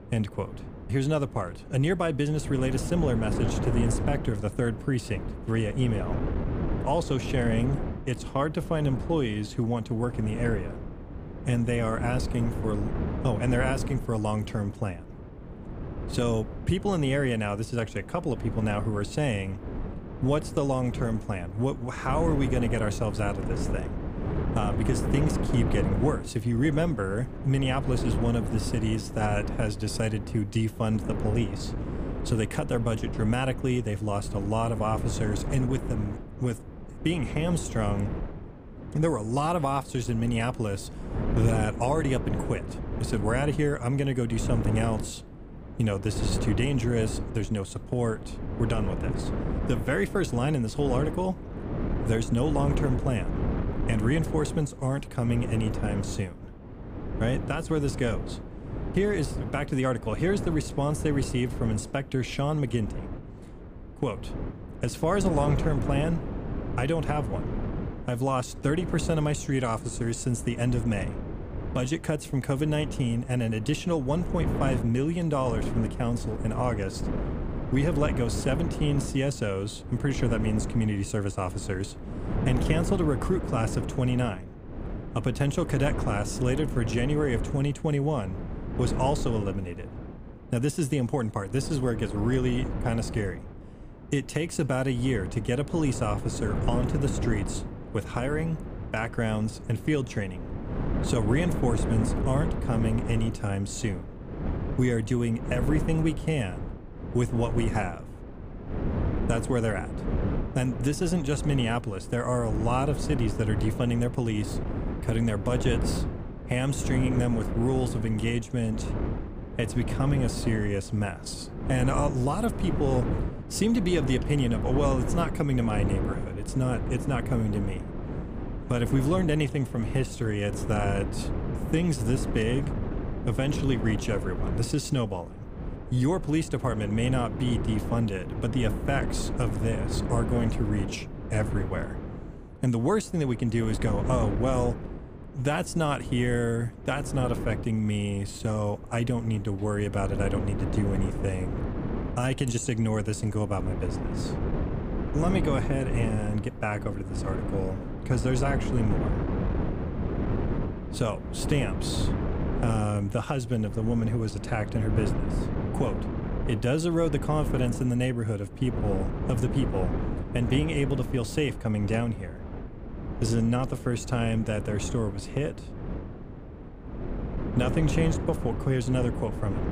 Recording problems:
wind noise on the microphone; heavy; 7 dB below the speech

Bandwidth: 15 kHz